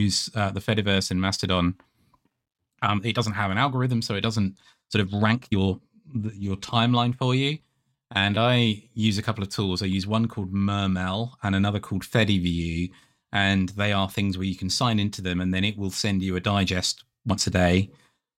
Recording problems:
abrupt cut into speech; at the start
uneven, jittery; strongly; from 2.5 to 17 s

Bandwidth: 16.5 kHz